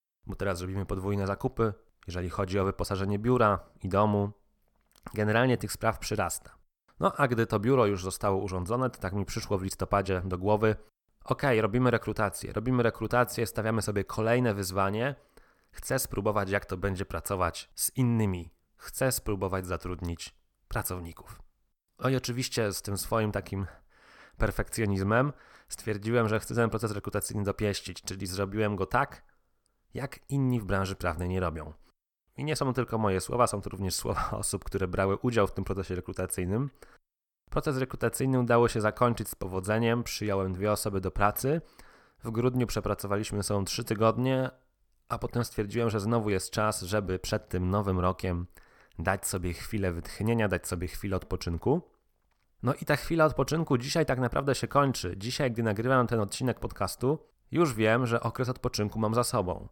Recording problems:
none

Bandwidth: 18 kHz